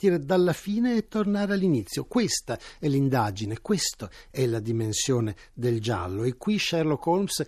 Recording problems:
none

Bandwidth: 13.5 kHz